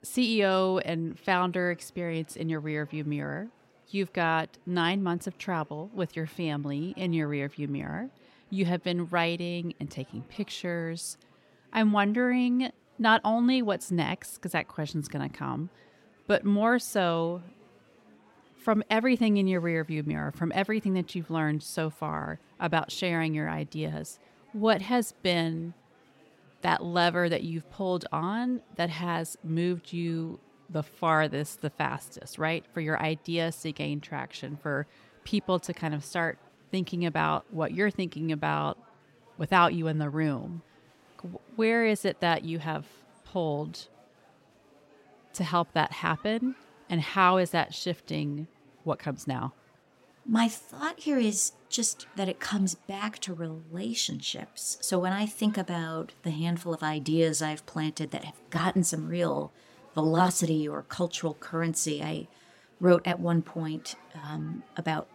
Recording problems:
murmuring crowd; faint; throughout; 30 dB below the speech

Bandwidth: 16 kHz